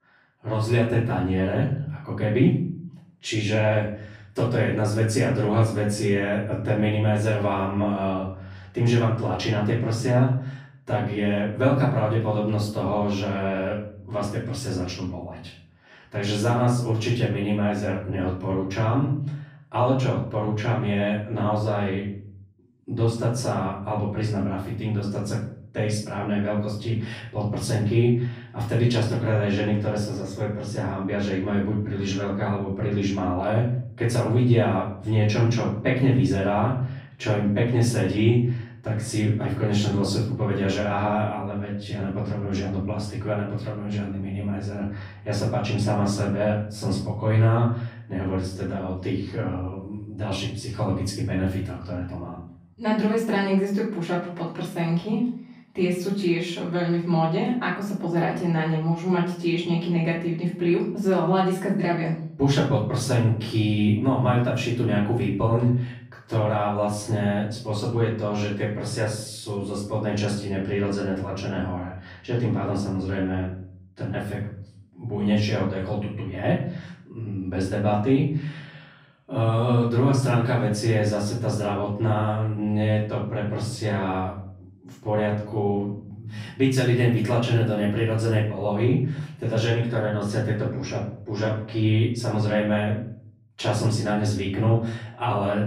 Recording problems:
off-mic speech; far
room echo; noticeable; dies away in 0.6 s

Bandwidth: 15.5 kHz